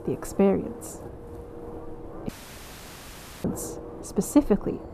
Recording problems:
muffled; very slightly; fading above 1.5 kHz
wind noise on the microphone; occasional gusts; 15 dB below the speech
rain or running water; faint; throughout; 25 dB below the speech
audio cutting out; at 2.5 s for 1 s

